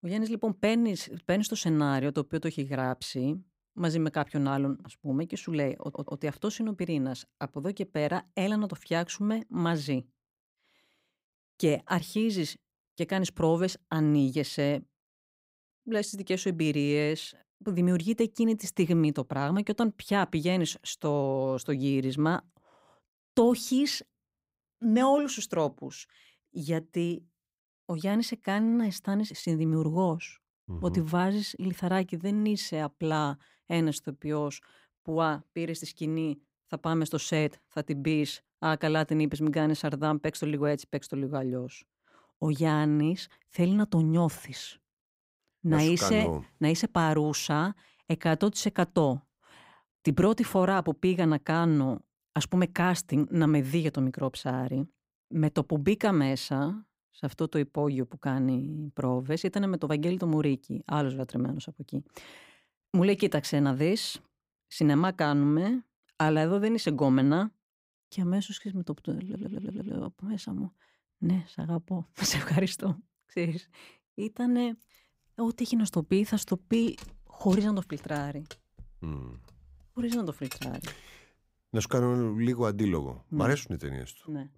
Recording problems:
audio stuttering; at 6 s and at 1:09
jangling keys; faint; from 1:16 to 1:21; peak 10 dB below the speech

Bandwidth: 15.5 kHz